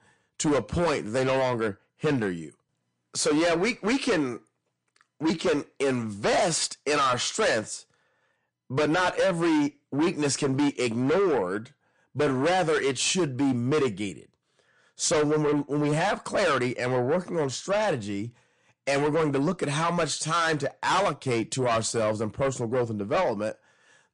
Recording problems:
distortion; heavy; 7 dB below the speech
garbled, watery; slightly; nothing above 9 kHz

